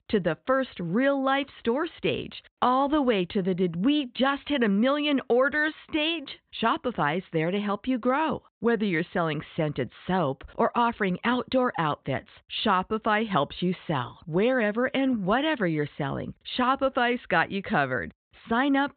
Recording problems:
high frequencies cut off; severe; nothing above 4 kHz

